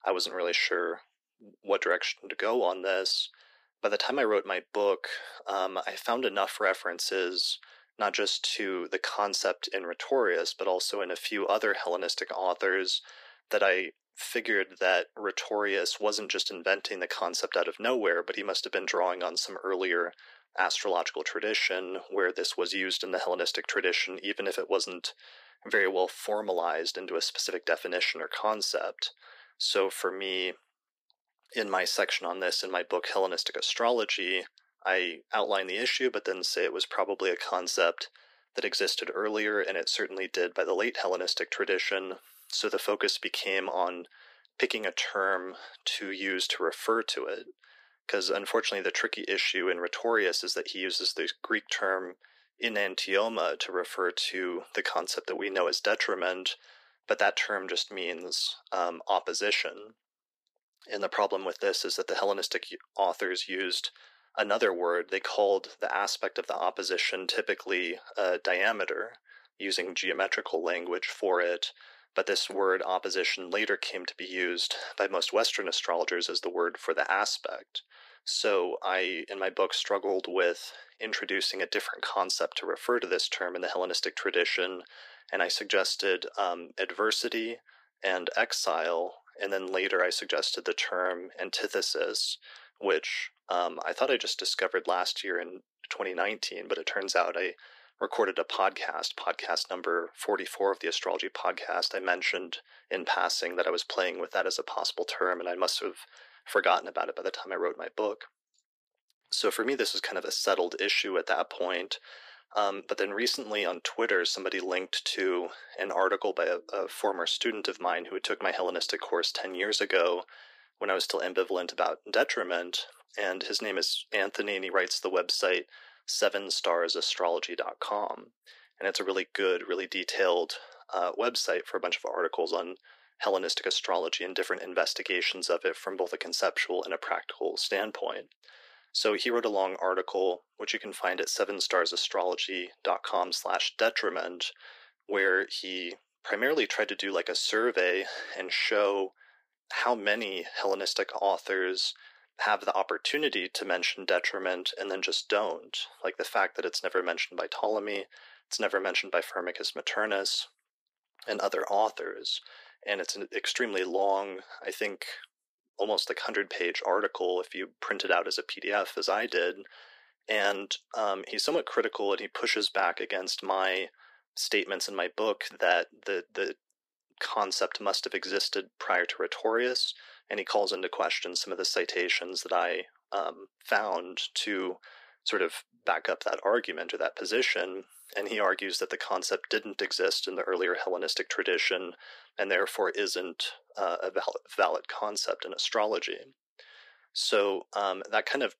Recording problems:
thin; very; fading below 350 Hz

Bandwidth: 15 kHz